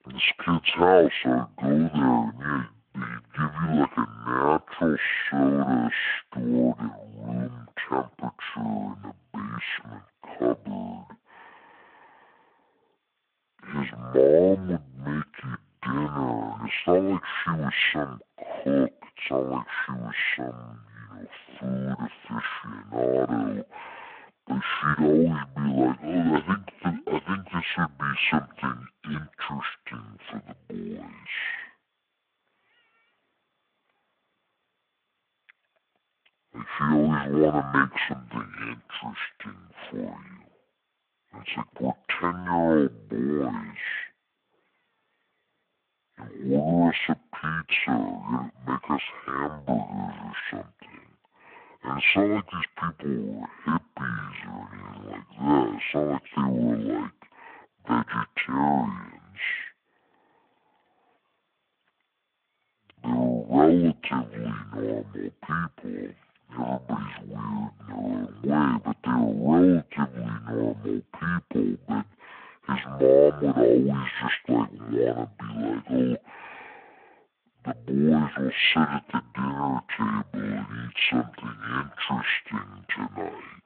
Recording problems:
wrong speed and pitch; too slow and too low; 0.5 times normal speed
phone-call audio

